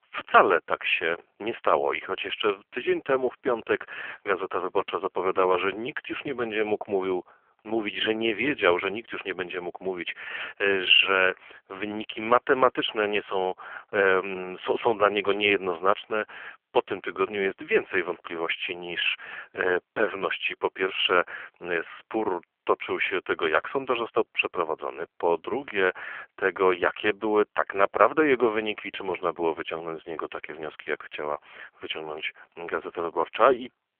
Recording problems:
phone-call audio; poor line; nothing above 3 kHz

